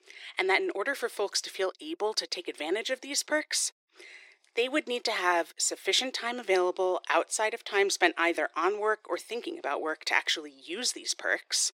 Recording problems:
thin; very; fading below 350 Hz

